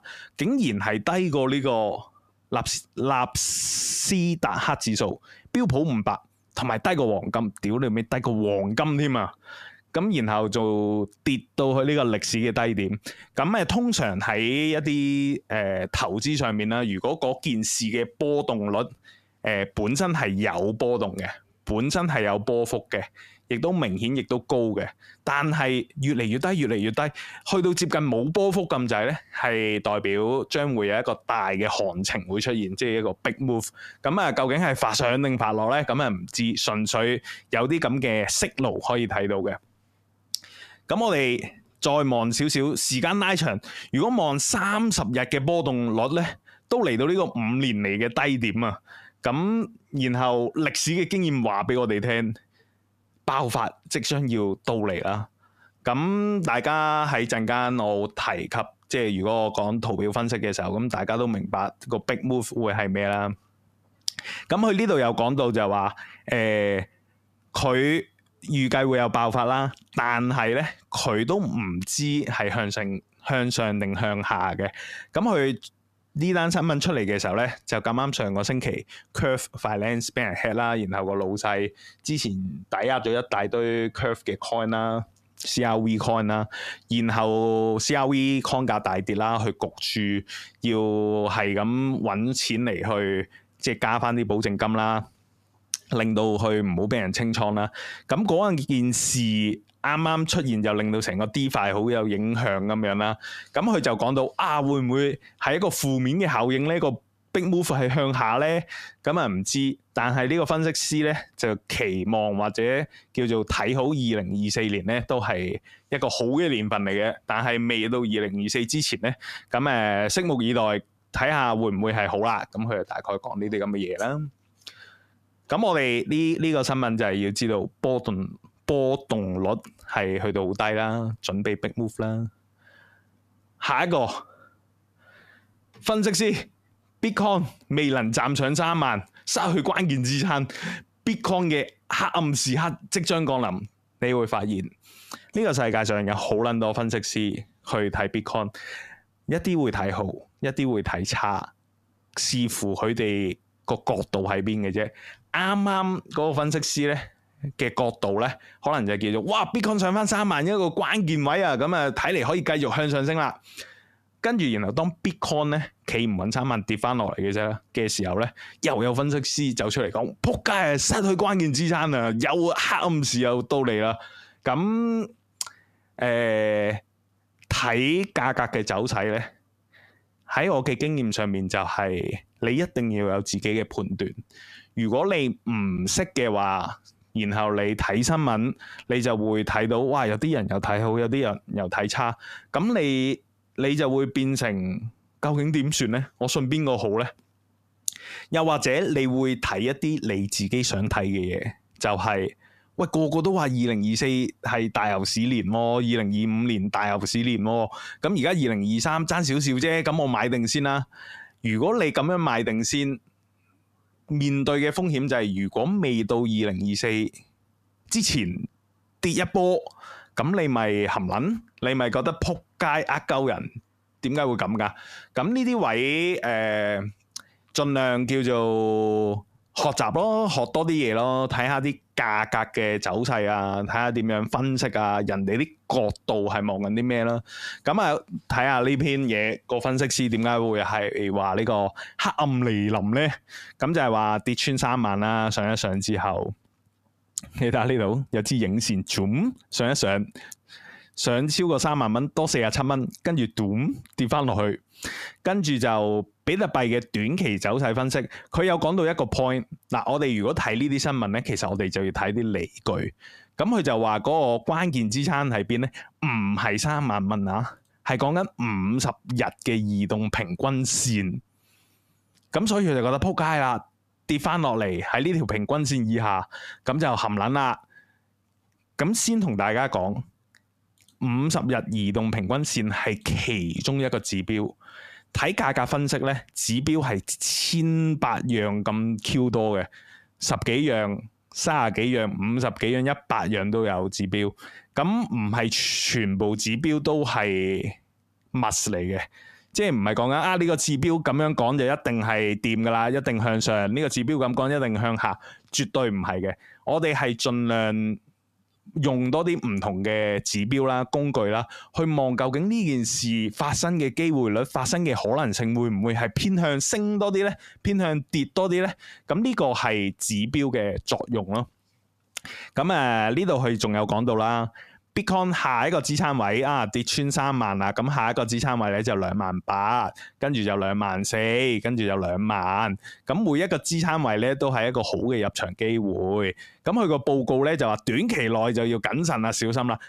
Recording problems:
squashed, flat; heavily

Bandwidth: 14.5 kHz